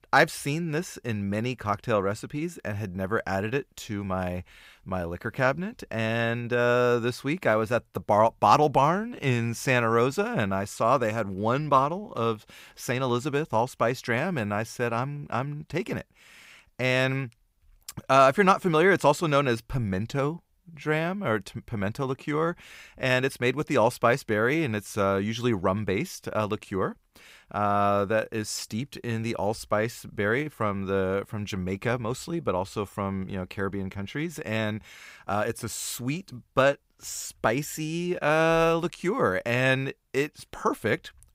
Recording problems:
none

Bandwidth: 15.5 kHz